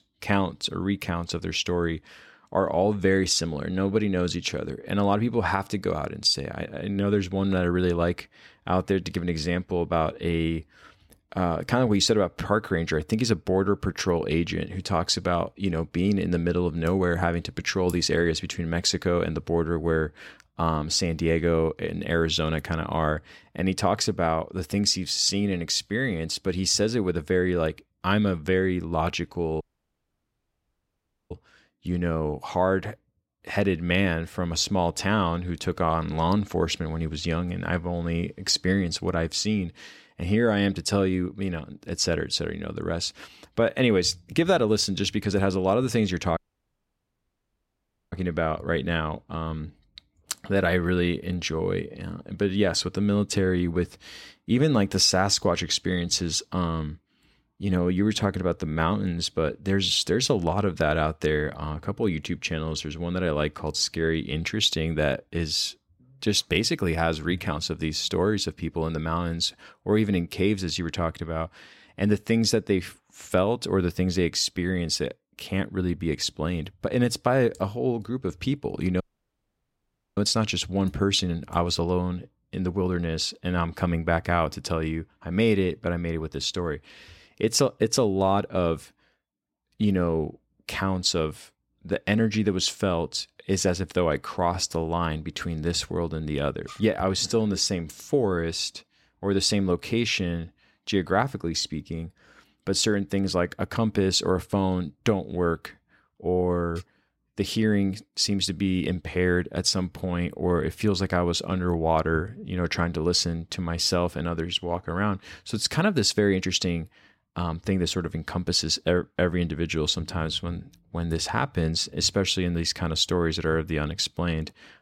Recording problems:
audio cutting out; at 30 s for 1.5 s, at 46 s for 2 s and at 1:19 for 1 s

